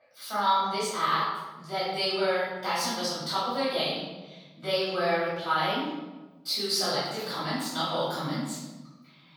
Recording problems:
room echo; strong; dies away in 1.4 s
off-mic speech; far
thin; very slightly; fading below 1 kHz

